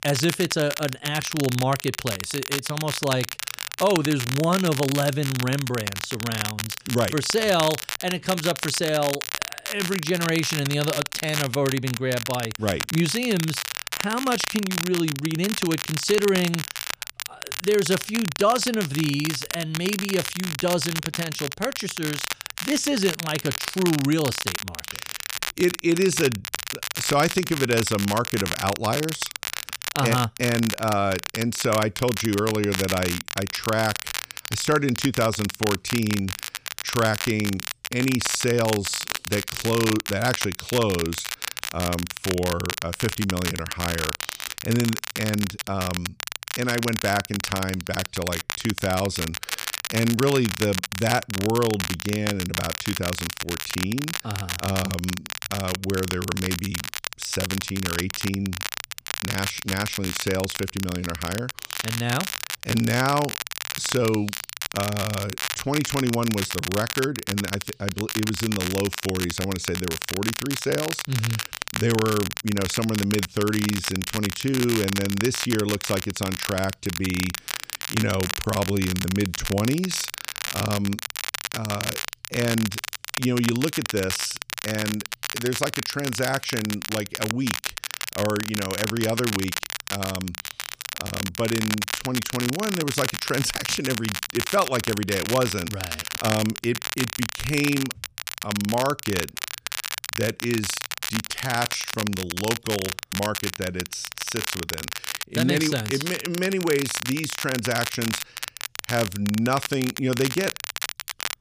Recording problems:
crackle, like an old record; loud; 4 dB below the speech

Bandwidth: 15 kHz